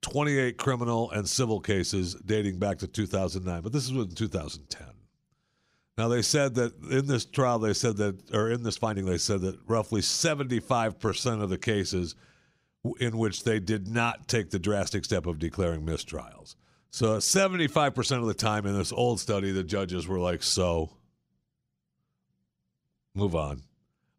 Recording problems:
uneven, jittery; strongly; from 7.5 to 21 s

